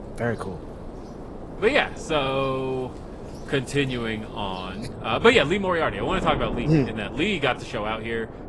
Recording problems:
garbled, watery; slightly; nothing above 11 kHz
wind noise on the microphone; occasional gusts; 15 dB below the speech
rain or running water; faint; throughout; 25 dB below the speech

